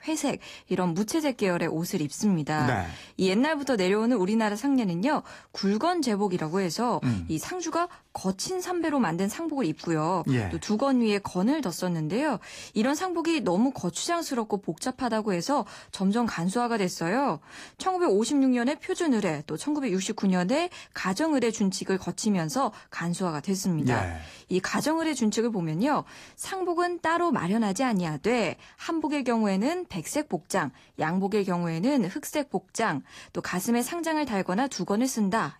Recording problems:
garbled, watery; slightly; nothing above 15 kHz

